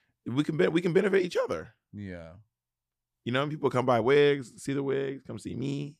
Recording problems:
none

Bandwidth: 14.5 kHz